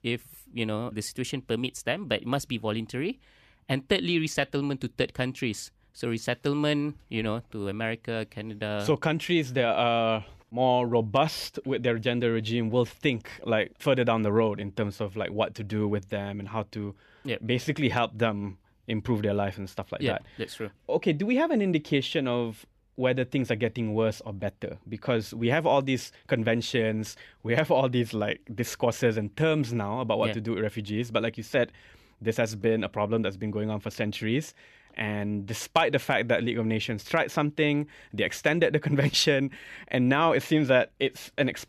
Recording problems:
none

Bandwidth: 14.5 kHz